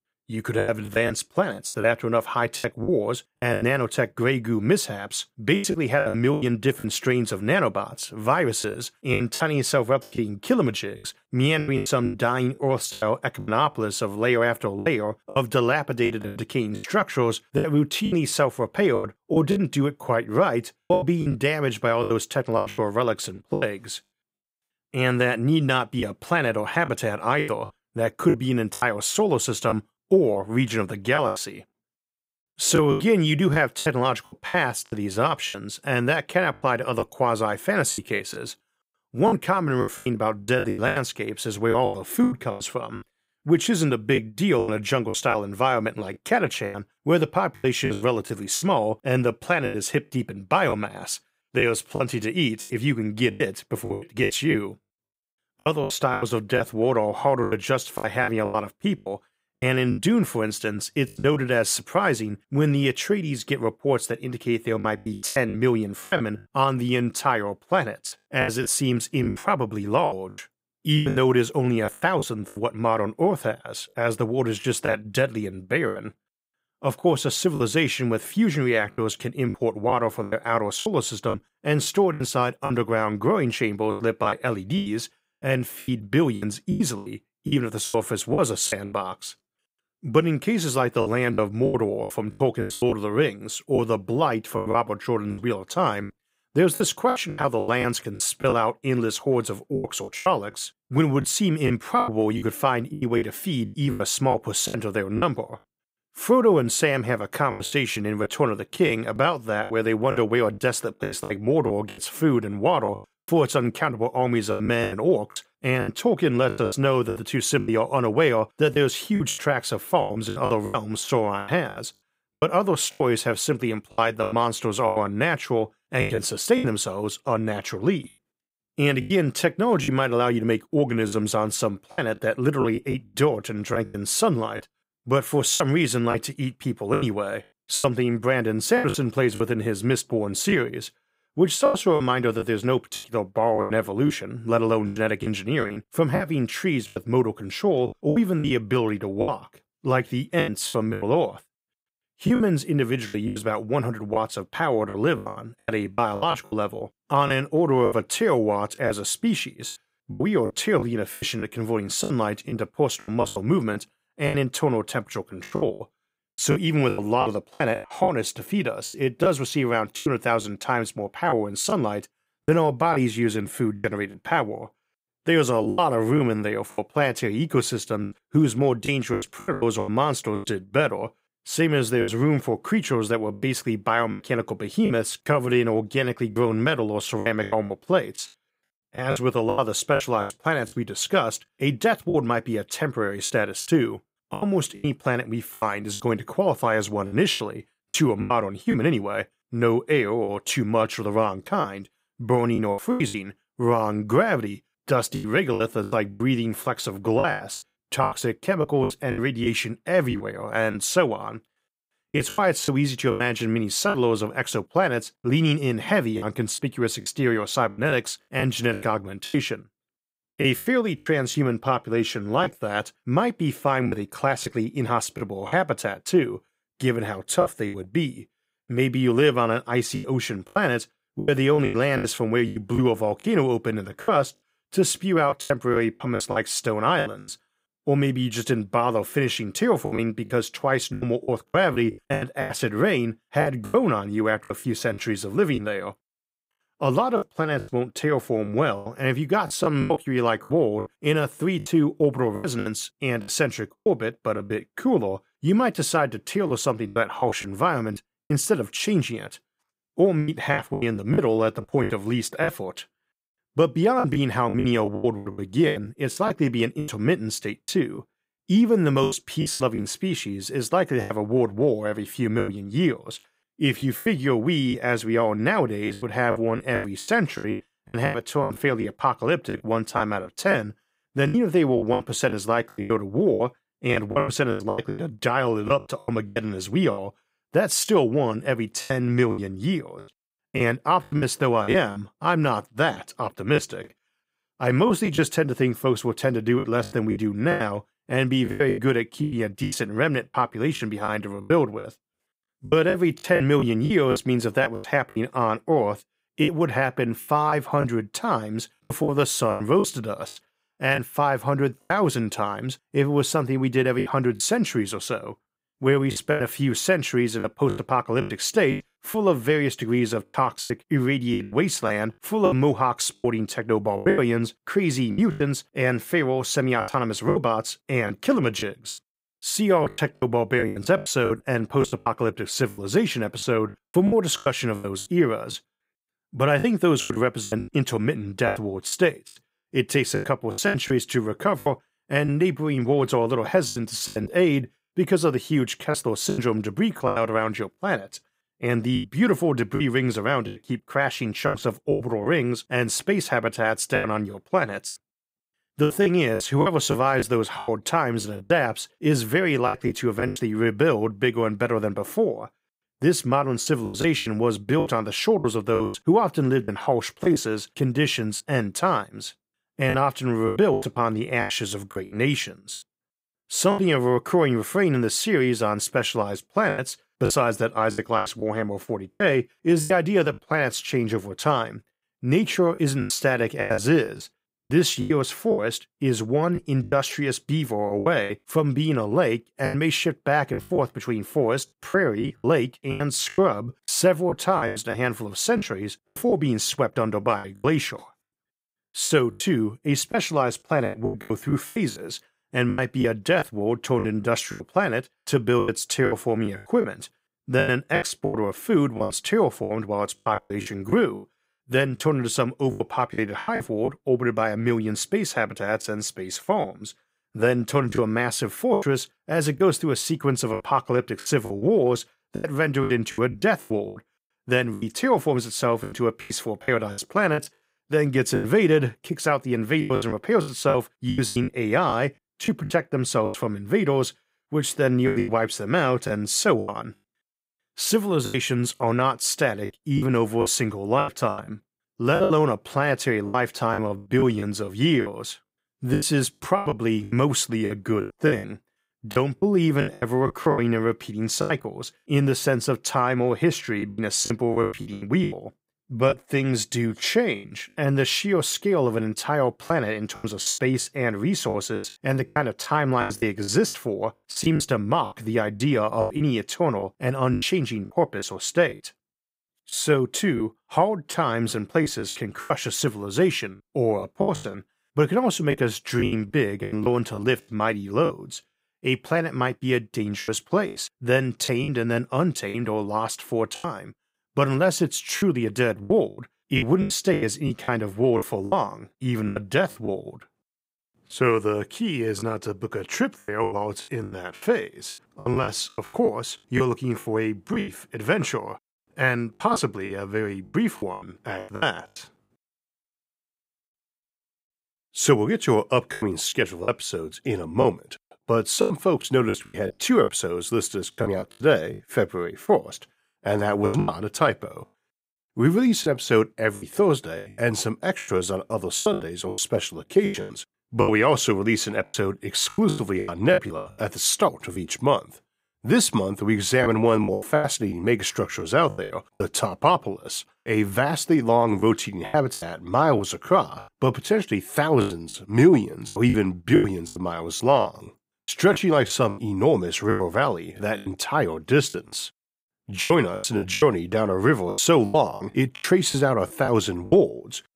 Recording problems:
choppy; very; 11% of the speech affected

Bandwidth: 15.5 kHz